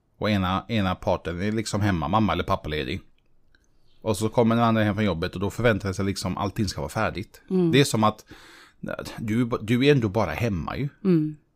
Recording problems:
none

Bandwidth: 15.5 kHz